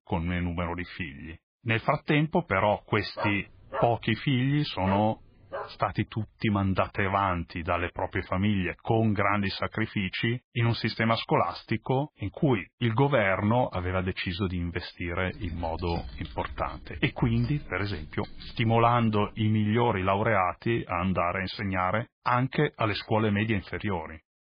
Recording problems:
garbled, watery; badly; nothing above 4.5 kHz
dog barking; noticeable; from 3 to 5.5 s; peak 7 dB below the speech
keyboard typing; faint; from 15 to 19 s; peak 15 dB below the speech

